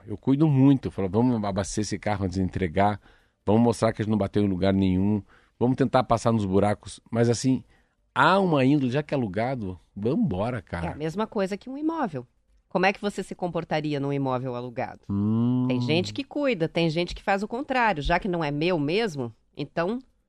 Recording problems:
none

